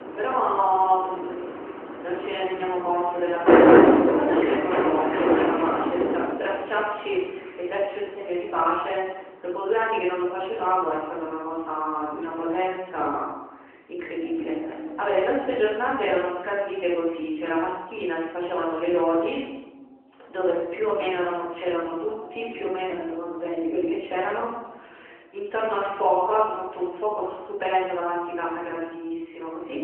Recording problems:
off-mic speech; far
room echo; noticeable; dies away in 1.3 s
phone-call audio
traffic noise; very faint; throughout; 4 dB above the speech

